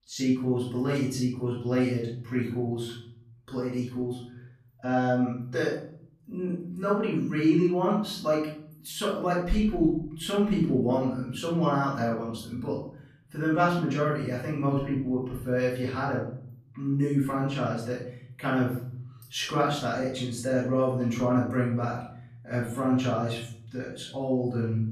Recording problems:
off-mic speech; far
room echo; noticeable; dies away in 0.9 s

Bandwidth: 14.5 kHz